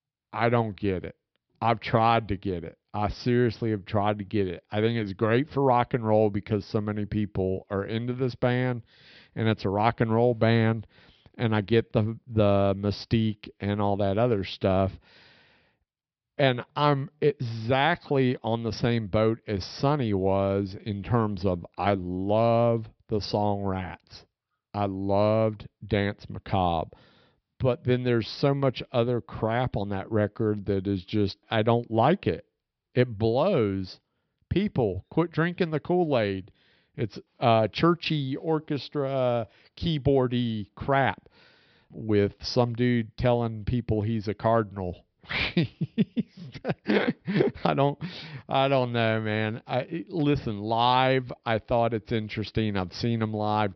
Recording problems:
high frequencies cut off; noticeable; nothing above 5.5 kHz

